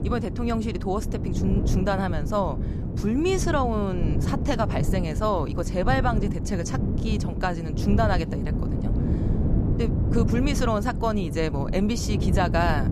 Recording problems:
wind noise on the microphone; heavy; 8 dB below the speech

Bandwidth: 14.5 kHz